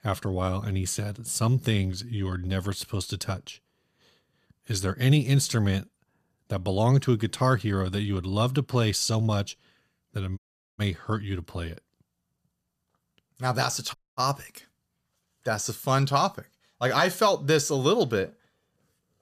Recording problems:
audio cutting out; at 10 s and at 14 s

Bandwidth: 14.5 kHz